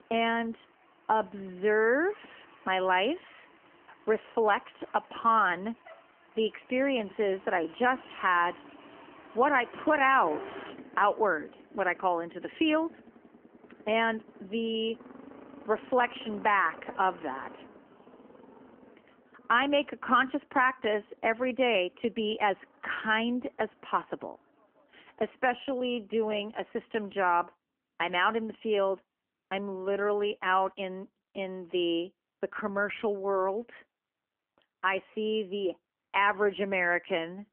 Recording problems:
phone-call audio; nothing above 3 kHz
traffic noise; faint; throughout; 20 dB below the speech

